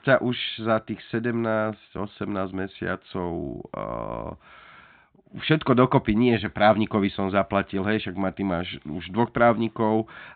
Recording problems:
high frequencies cut off; severe; nothing above 4 kHz

